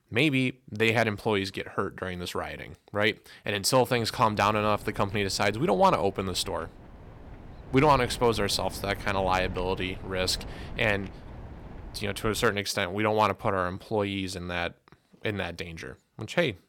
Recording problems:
wind noise on the microphone; occasional gusts; from 4 to 13 s; 20 dB below the speech

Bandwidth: 17.5 kHz